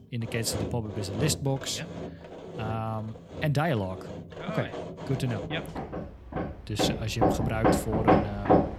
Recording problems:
machinery noise; very loud; throughout; 1 dB above the speech

